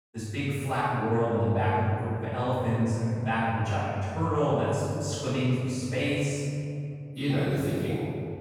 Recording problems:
room echo; strong; dies away in 2.6 s
off-mic speech; far

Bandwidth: 18 kHz